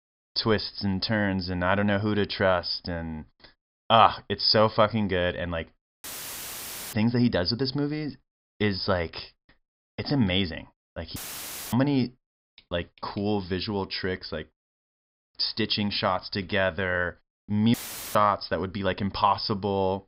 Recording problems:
high frequencies cut off; noticeable; nothing above 5.5 kHz
audio cutting out; filled with static; at 6 s for 1 s, at 11 s for 0.5 s and at 18 s

